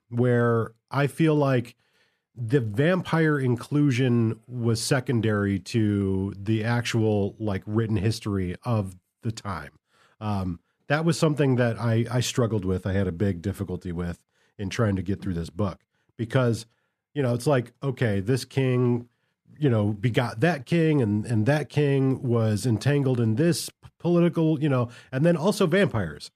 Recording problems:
none

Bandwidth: 14.5 kHz